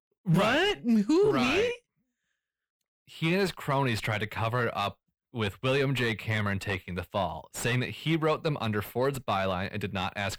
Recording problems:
distortion; slight; 10 dB below the speech

